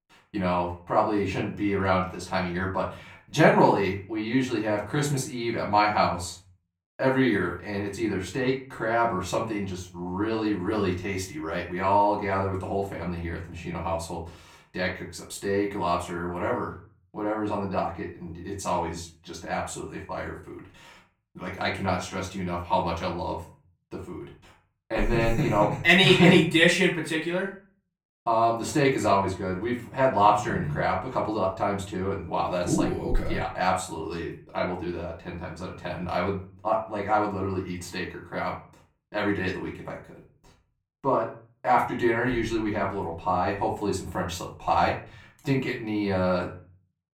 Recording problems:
off-mic speech; far
room echo; slight; dies away in 0.4 s

